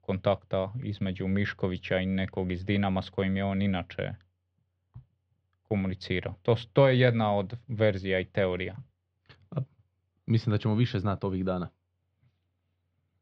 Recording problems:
muffled; slightly; fading above 4 kHz

